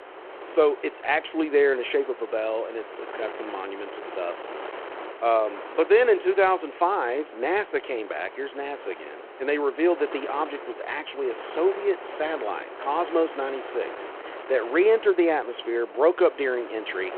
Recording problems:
phone-call audio
wind noise on the microphone; occasional gusts; 15 dB below the speech

